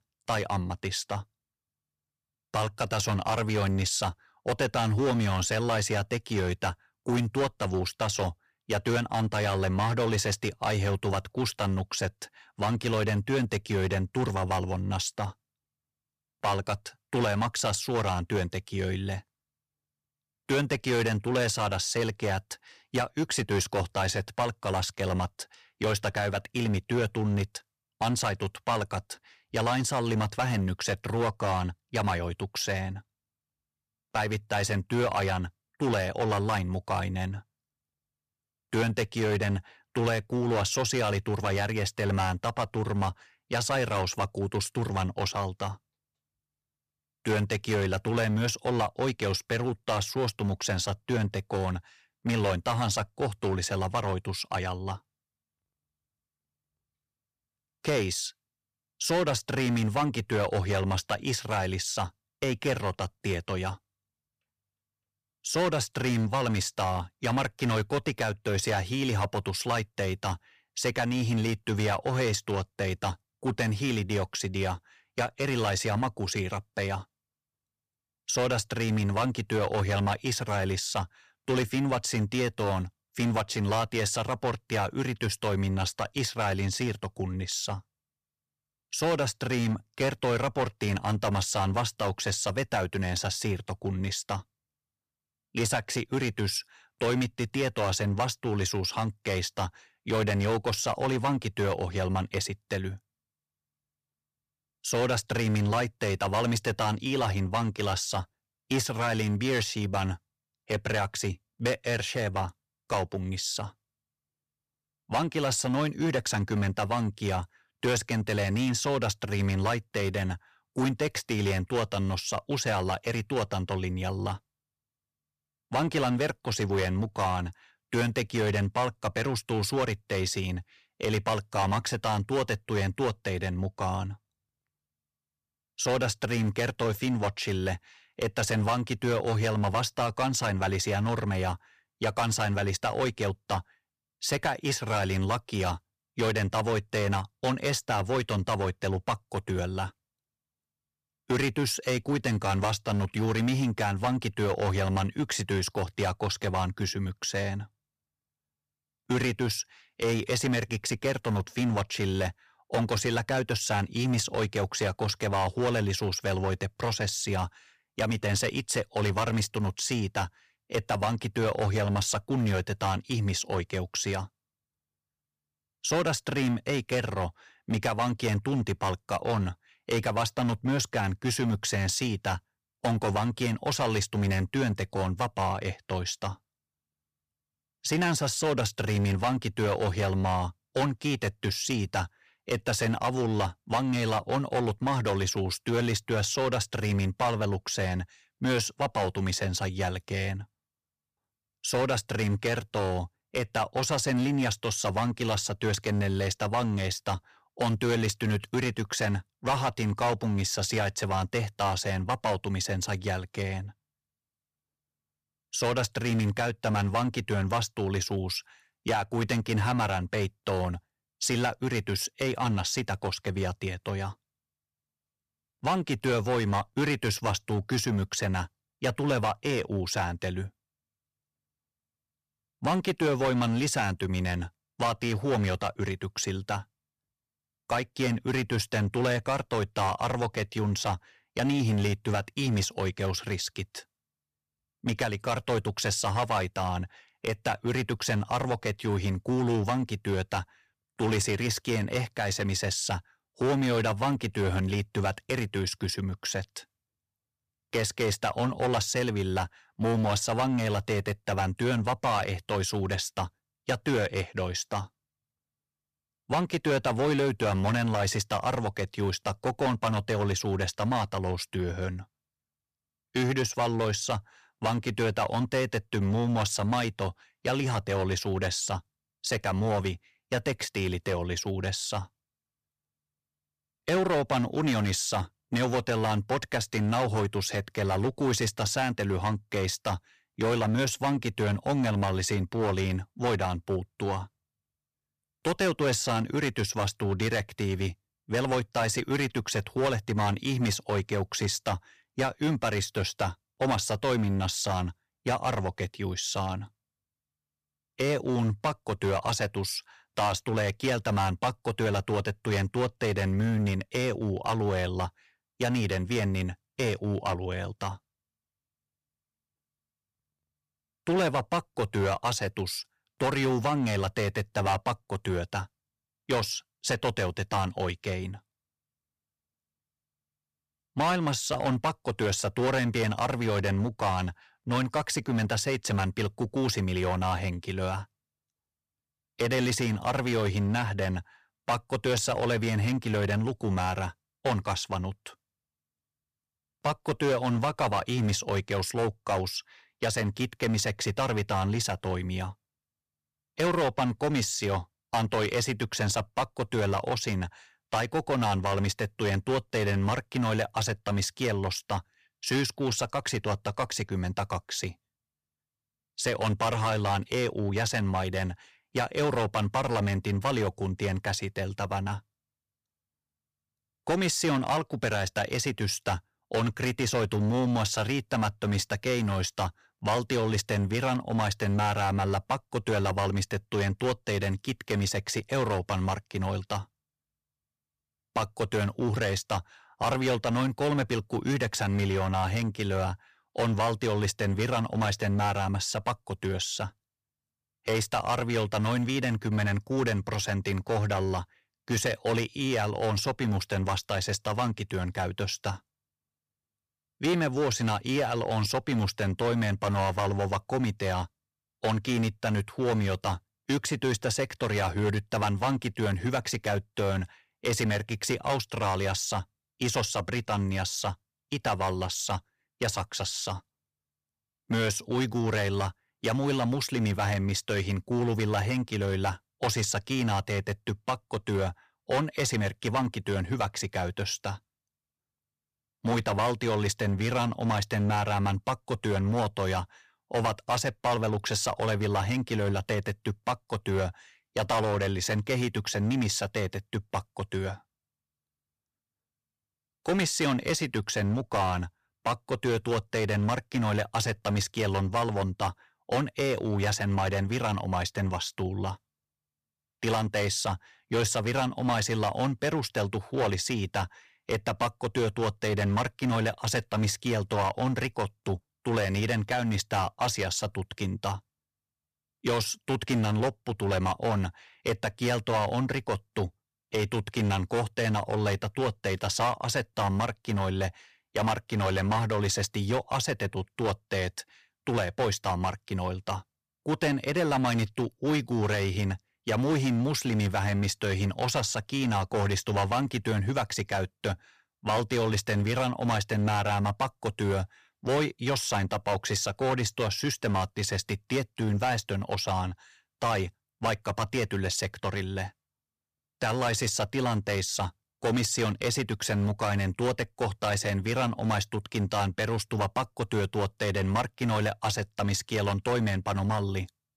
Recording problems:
distortion; heavy; 8% of the sound clipped

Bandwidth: 15 kHz